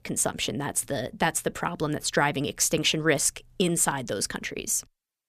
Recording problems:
none

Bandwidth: 14.5 kHz